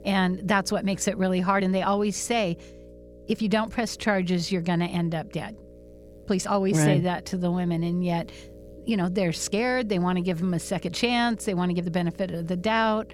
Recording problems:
electrical hum; faint; throughout; 60 Hz, 25 dB below the speech
uneven, jittery; strongly; from 0.5 to 12 s

